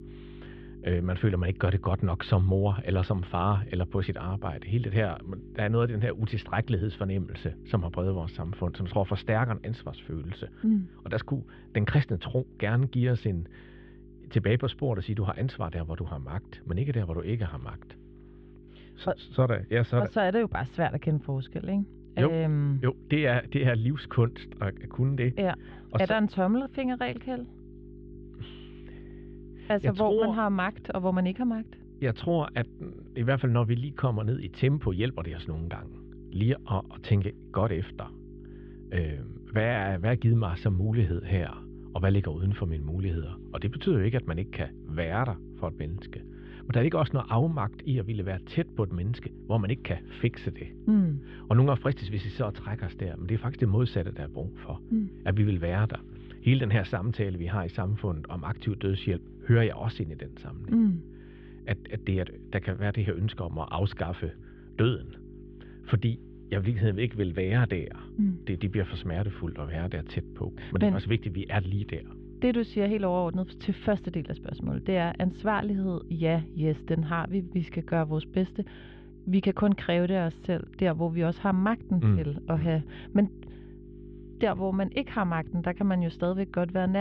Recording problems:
muffled; very; fading above 3.5 kHz
electrical hum; noticeable; throughout; 50 Hz, 20 dB below the speech
abrupt cut into speech; at the end

